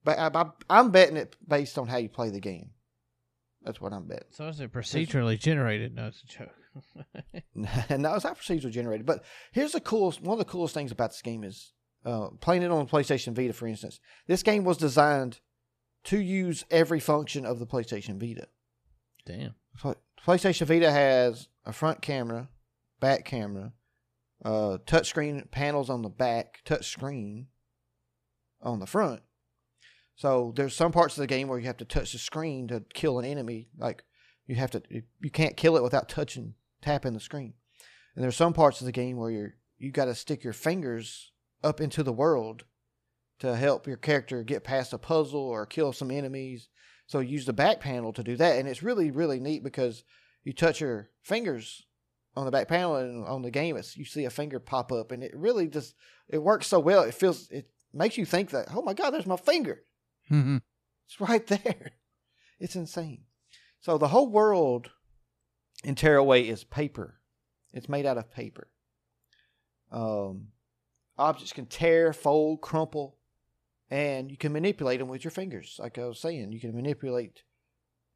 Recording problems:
none

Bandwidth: 14.5 kHz